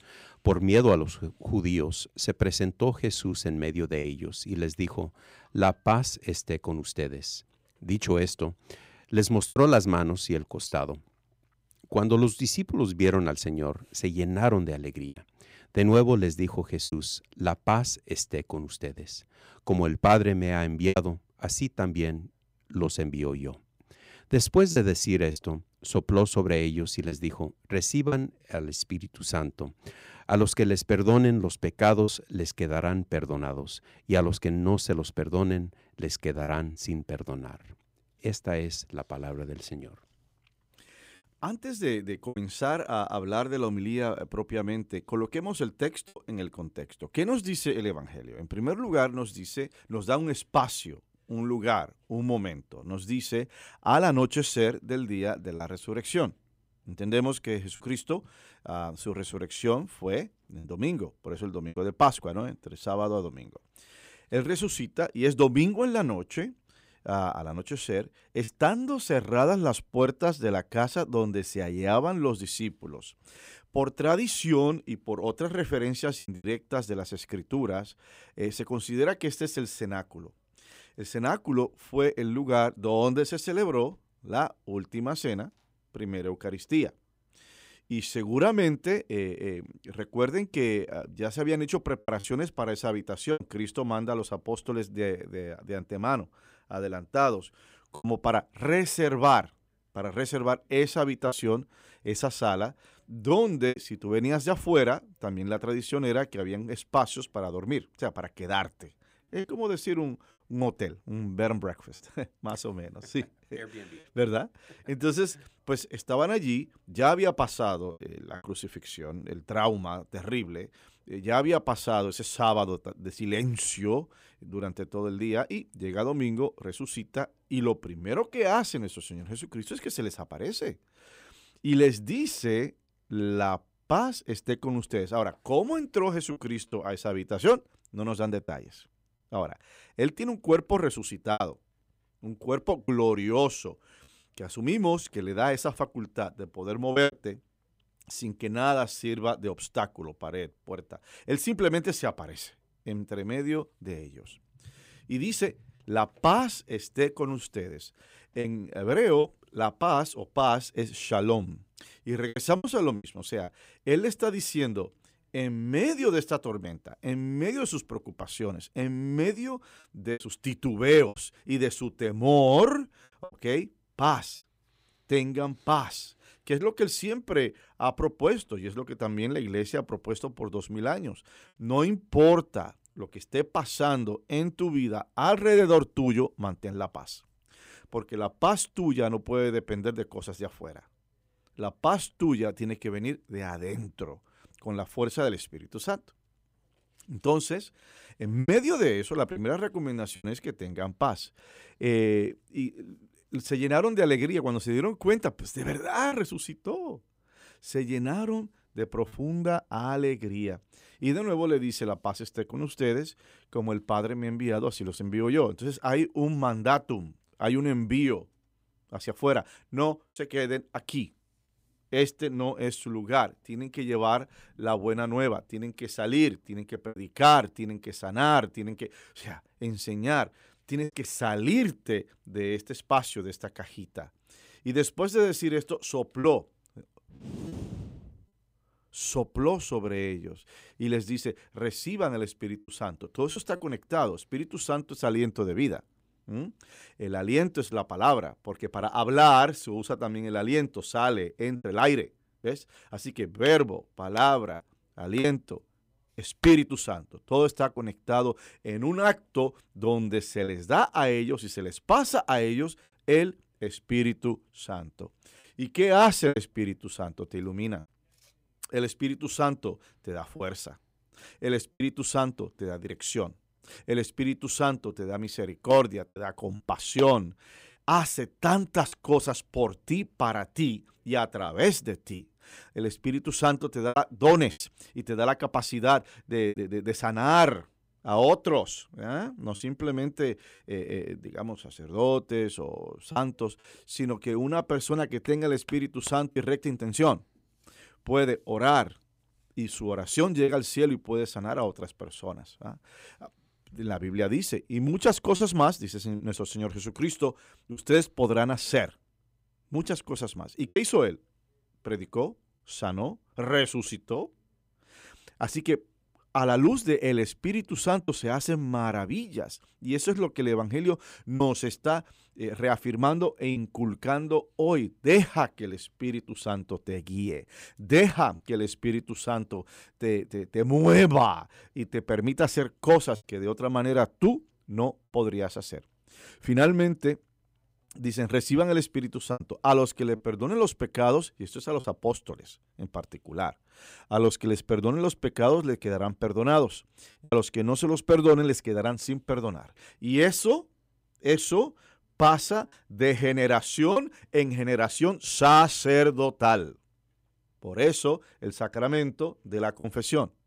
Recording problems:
choppy; occasionally; 2% of the speech affected

